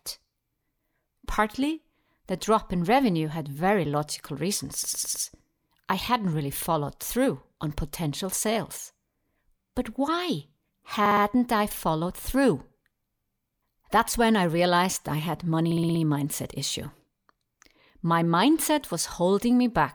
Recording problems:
audio stuttering; at 4.5 s, at 11 s and at 16 s

